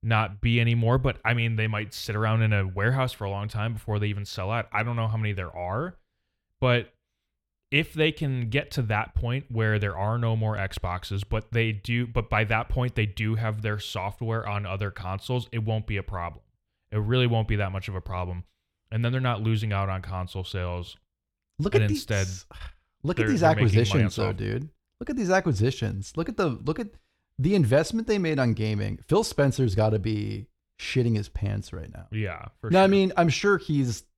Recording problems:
none

